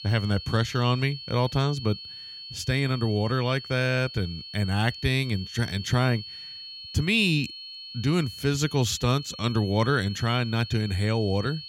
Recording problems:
high-pitched whine; noticeable; throughout; 4.5 kHz, 10 dB below the speech

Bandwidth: 16.5 kHz